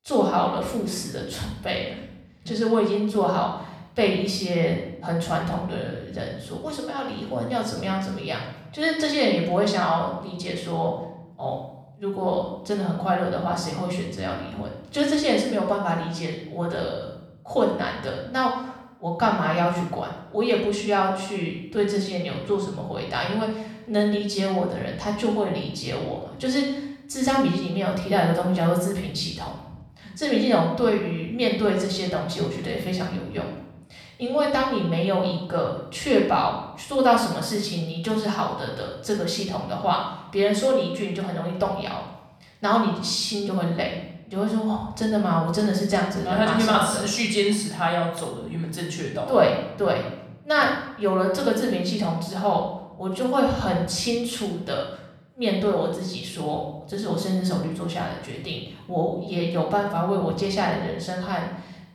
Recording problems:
off-mic speech; far
room echo; noticeable; dies away in 0.7 s

